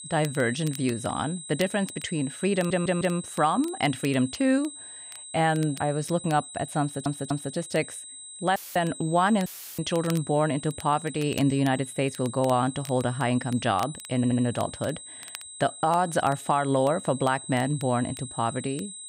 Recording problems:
high-pitched whine; noticeable; throughout; 8 kHz, 15 dB below the speech
crackle, like an old record; faint; 20 dB below the speech
audio stuttering; at 2.5 s, at 7 s and at 14 s
audio cutting out; filled with static; at 8.5 s and at 9.5 s

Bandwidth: 15.5 kHz